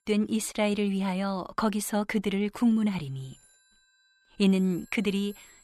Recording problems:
alarms or sirens; faint; throughout; 30 dB below the speech

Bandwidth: 13.5 kHz